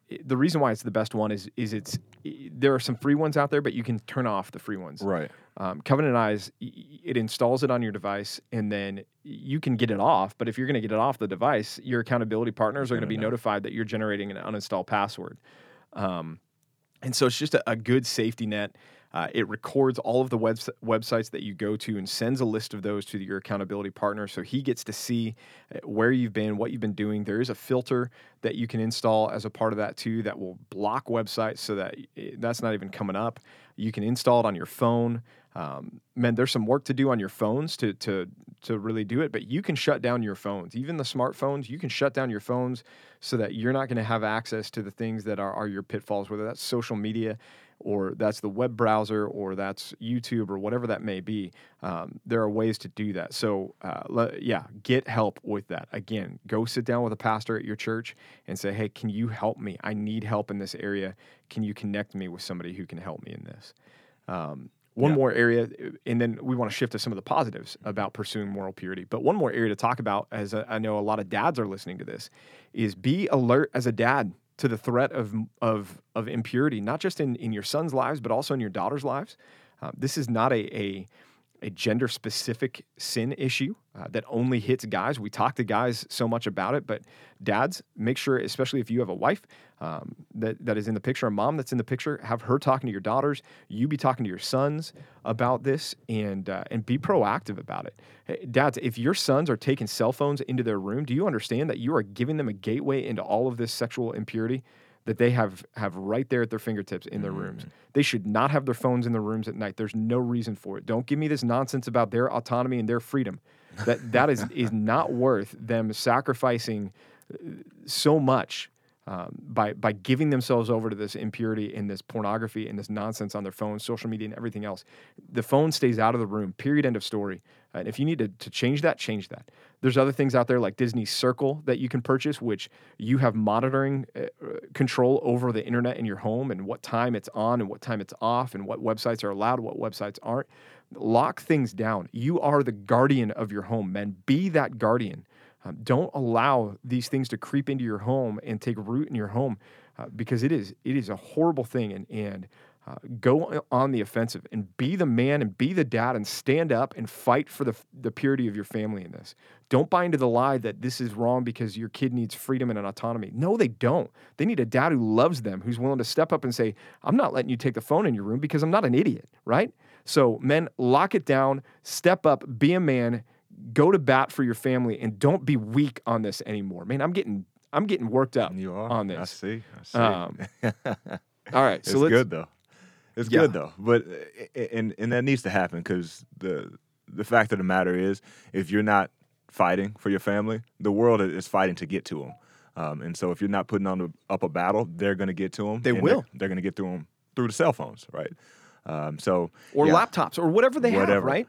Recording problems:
none

